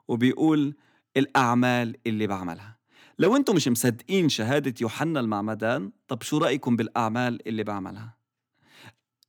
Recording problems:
none

